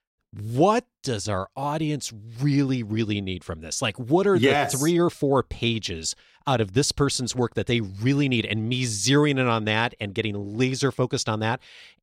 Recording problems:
none

